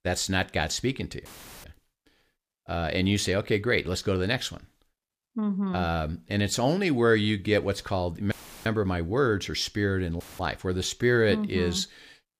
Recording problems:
audio cutting out; filled with static; at 1.5 s, at 8.5 s and at 10 s

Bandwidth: 15 kHz